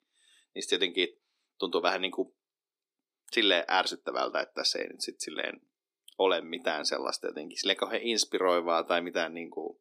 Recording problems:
thin; somewhat; fading below 300 Hz

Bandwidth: 15 kHz